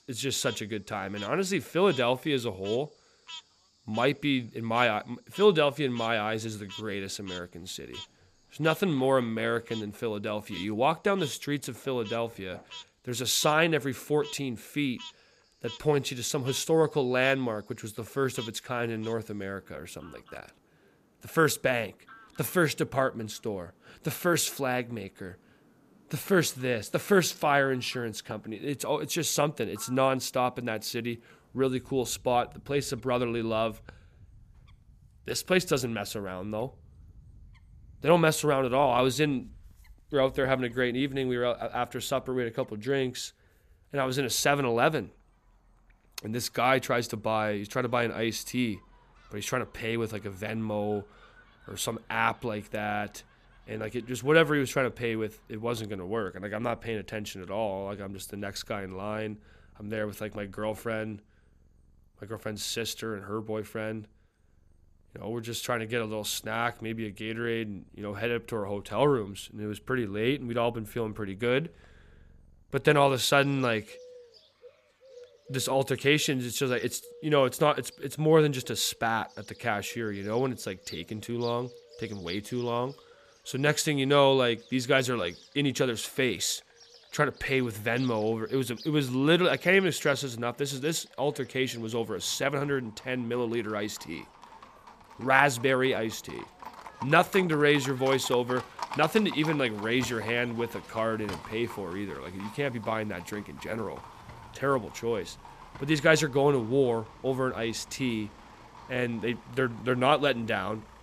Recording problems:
animal sounds; noticeable; throughout; 20 dB below the speech

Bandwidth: 14.5 kHz